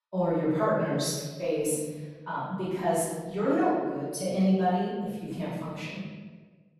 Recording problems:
room echo; strong; dies away in 1.3 s
off-mic speech; far

